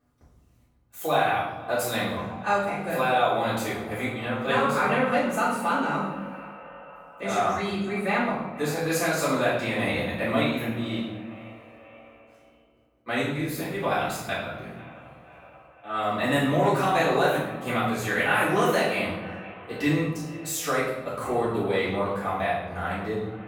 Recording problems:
off-mic speech; far
echo of what is said; noticeable; throughout; 480 ms later, 15 dB below the speech
room echo; noticeable; dies away in 1.2 s

